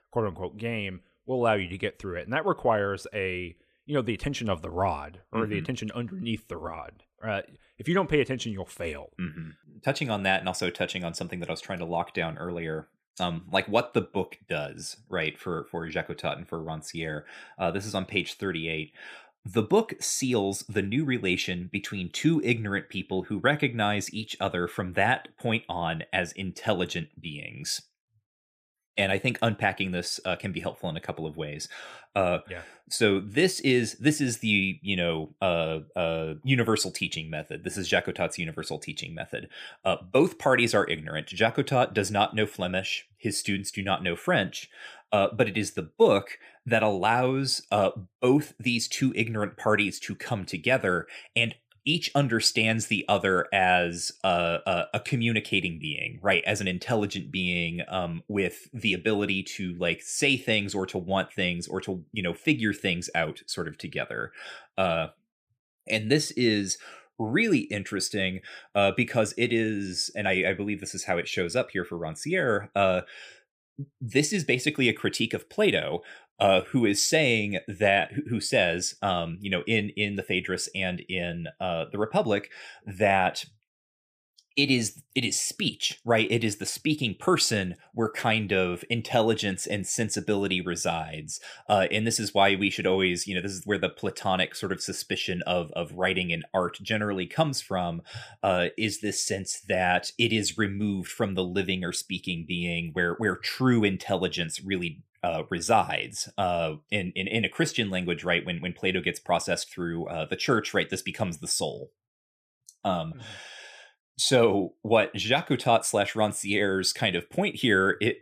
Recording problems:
none

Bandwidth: 15 kHz